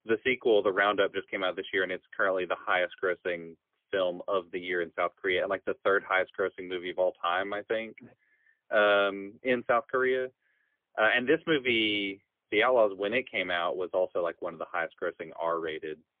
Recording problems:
phone-call audio; poor line; nothing above 3.5 kHz

